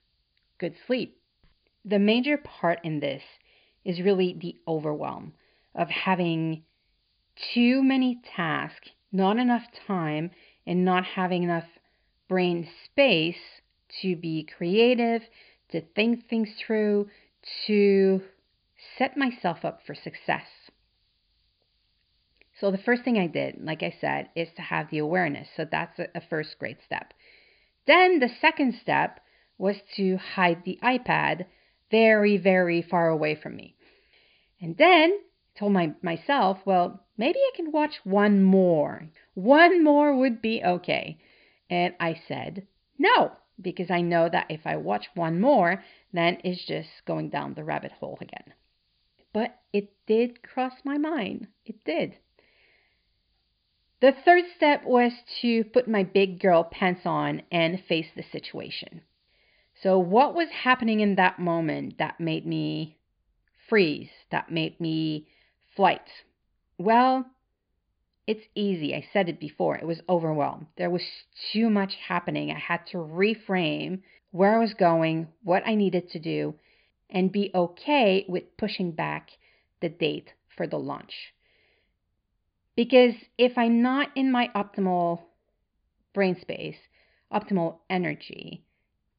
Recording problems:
high frequencies cut off; severe; nothing above 5 kHz
hiss; very faint; until 1:01; 45 dB below the speech

